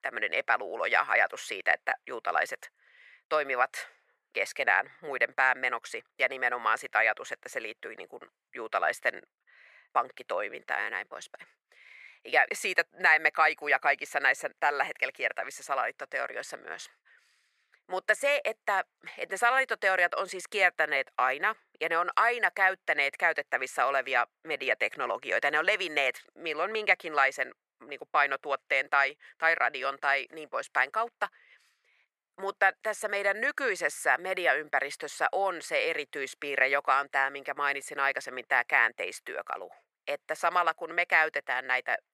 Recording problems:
thin; very; fading below 650 Hz

